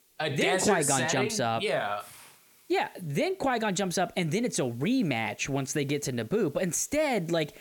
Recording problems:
hiss; faint; throughout; 30 dB below the speech

